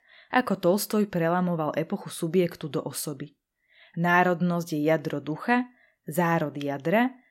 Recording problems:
none

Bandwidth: 16 kHz